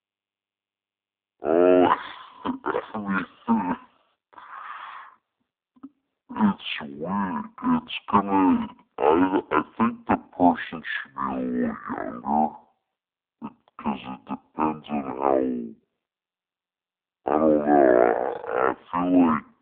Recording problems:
phone-call audio; poor line
wrong speed and pitch; too slow and too low; 0.5 times normal speed

